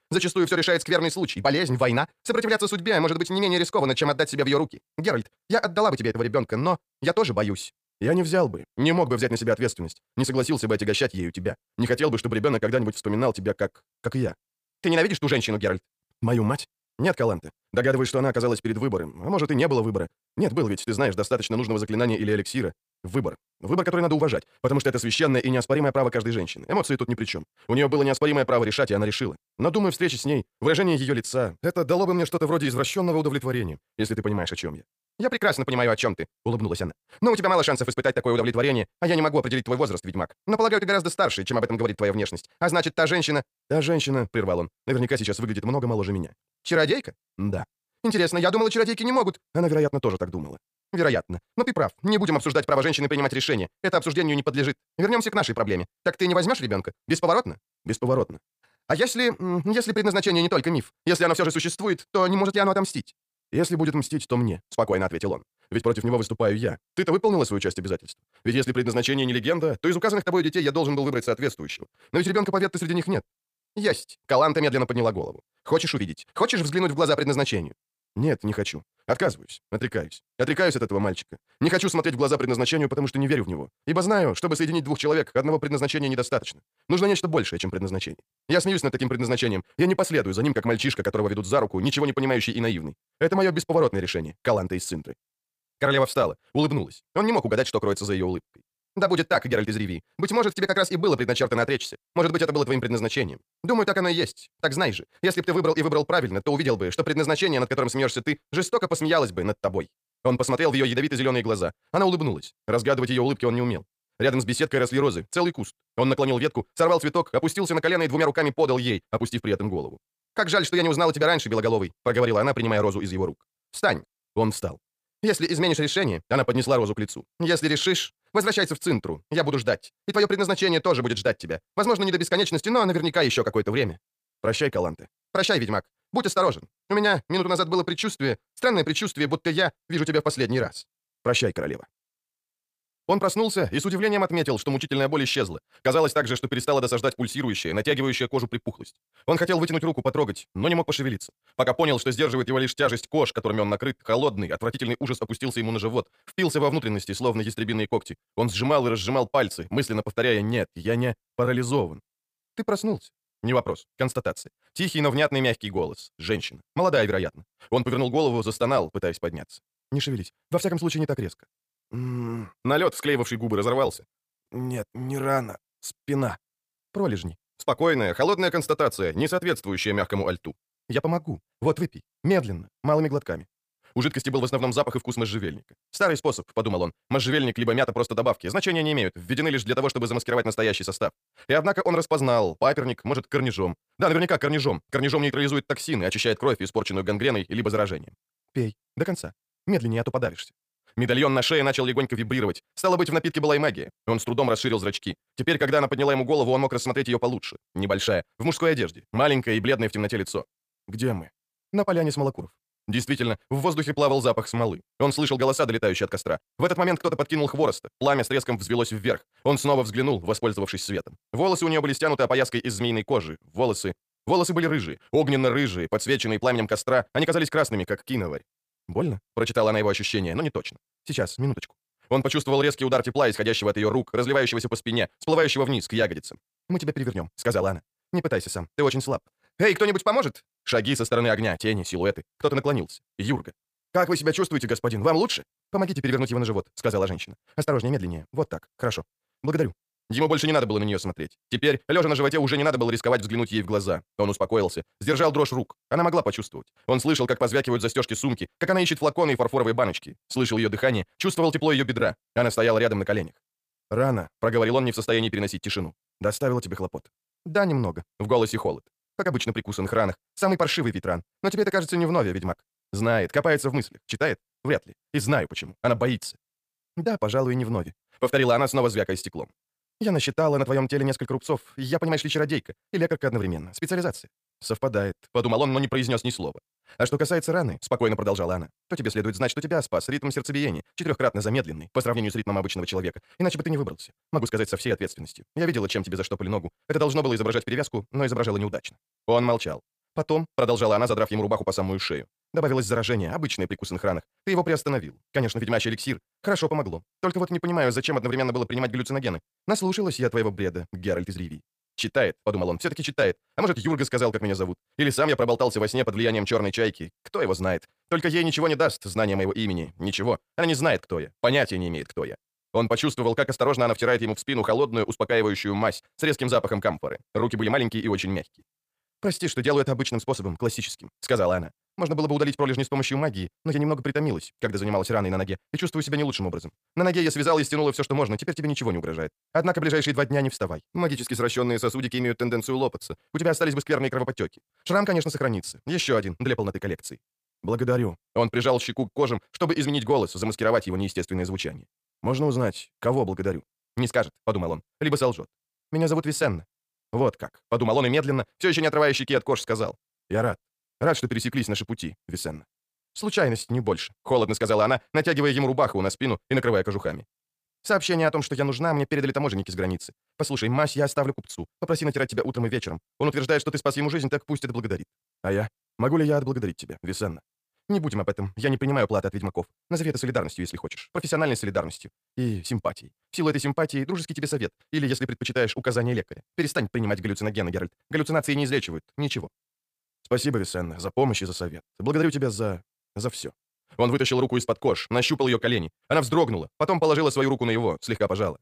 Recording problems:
wrong speed, natural pitch; too fast; 1.7 times normal speed

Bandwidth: 15 kHz